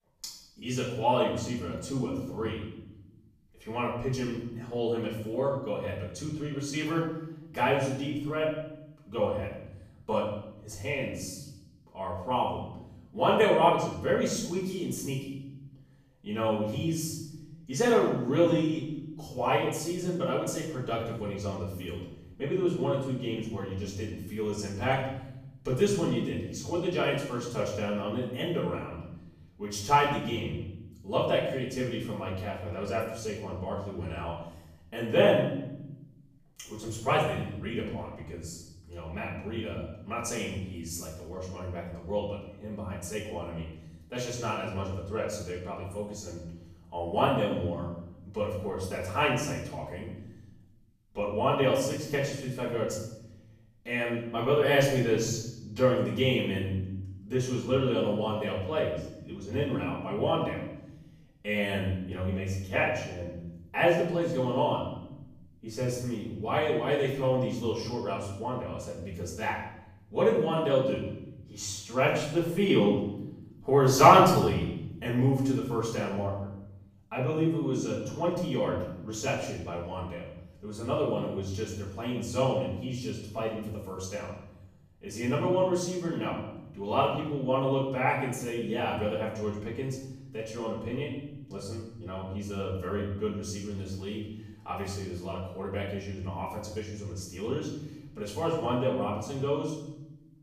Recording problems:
off-mic speech; far
room echo; noticeable; dies away in 0.9 s

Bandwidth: 15 kHz